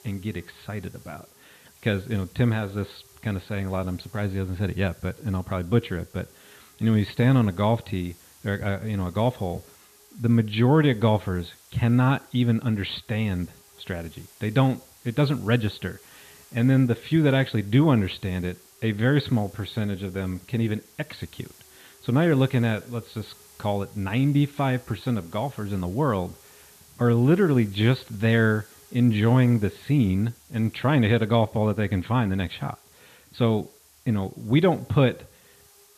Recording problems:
high frequencies cut off; severe; nothing above 4.5 kHz
hiss; faint; throughout; 25 dB below the speech

